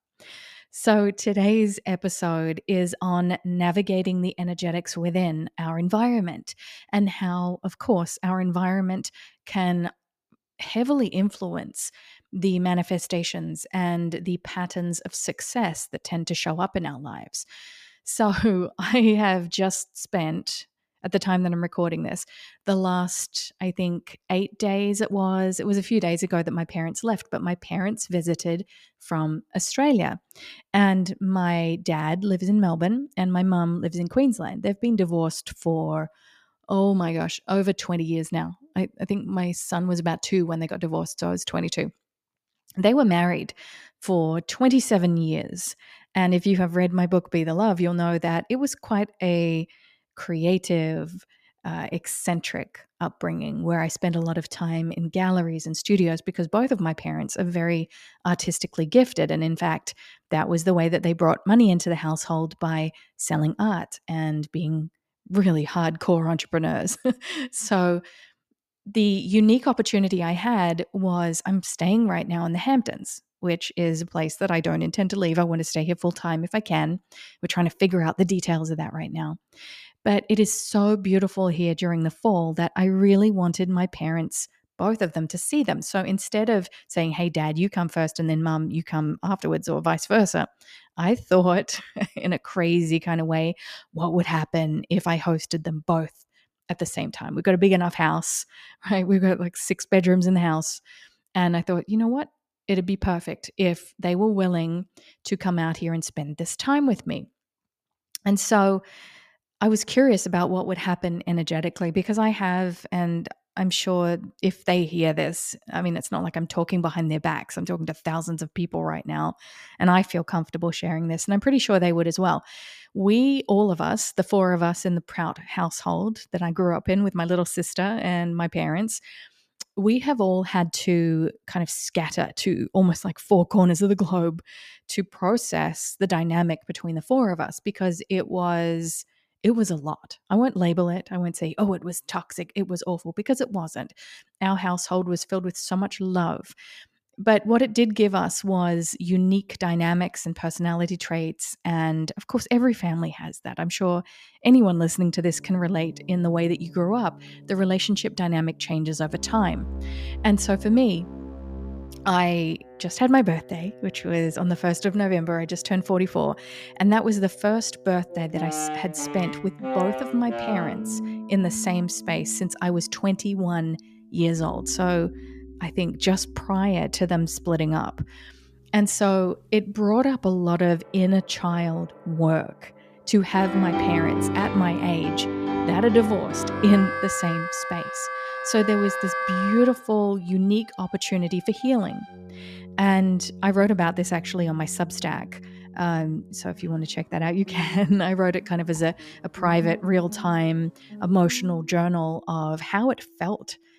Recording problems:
background music; loud; from 2:35 on; 9 dB below the speech

